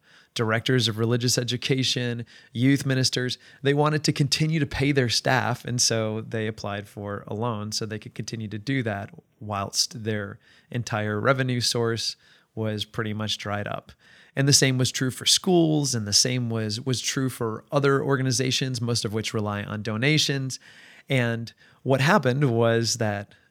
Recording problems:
none

